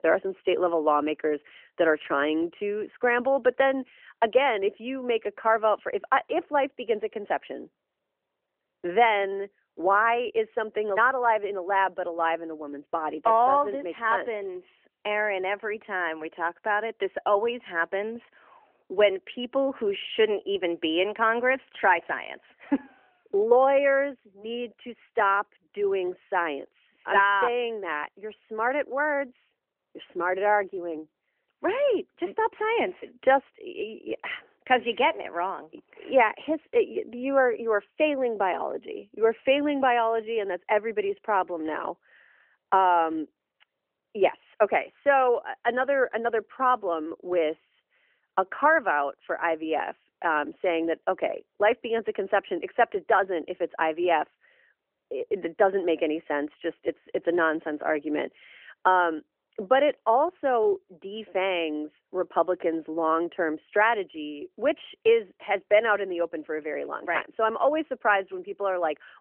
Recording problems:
phone-call audio; nothing above 3 kHz

